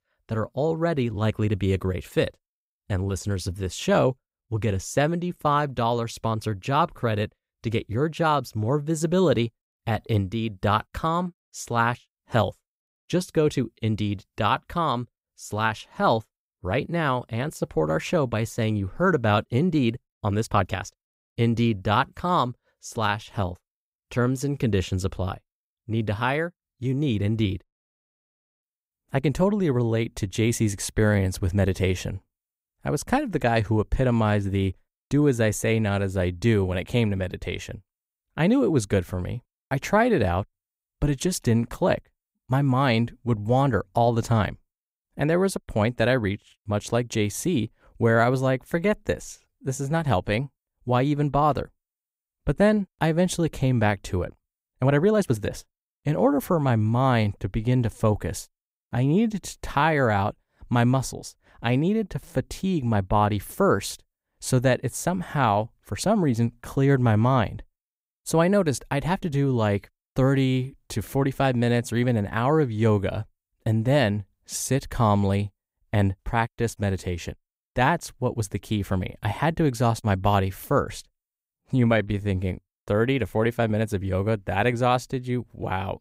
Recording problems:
uneven, jittery; strongly; from 10 s to 1:22

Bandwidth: 15.5 kHz